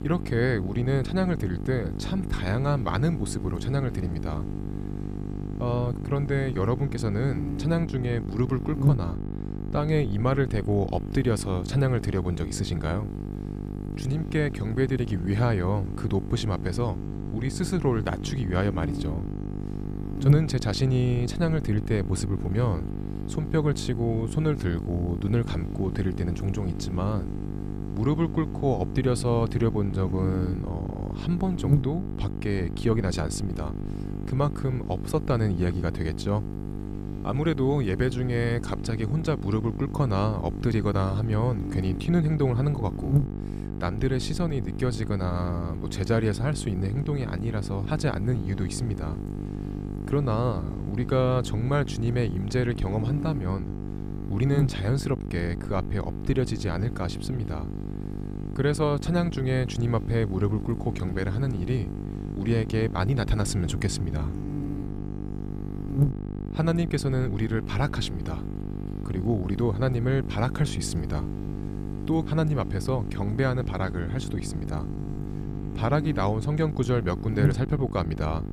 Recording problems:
electrical hum; loud; throughout; 50 Hz, 8 dB below the speech

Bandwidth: 14.5 kHz